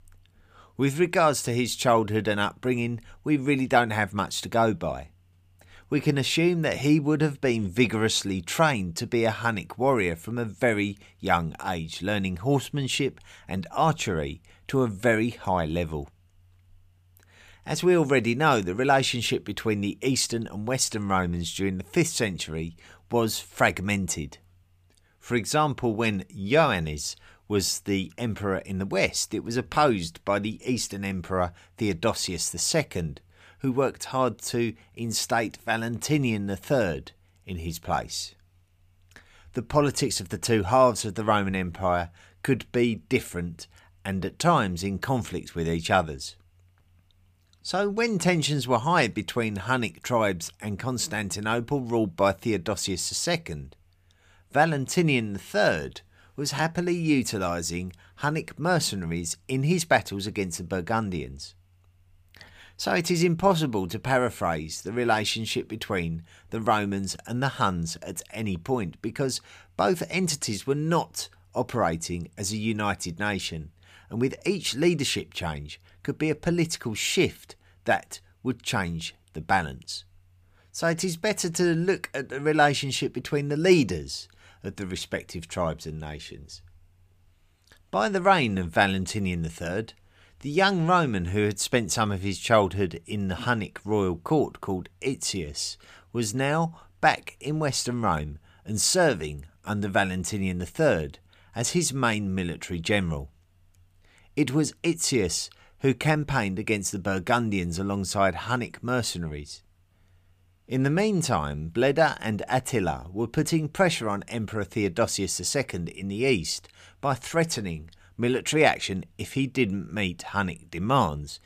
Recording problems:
none

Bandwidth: 15 kHz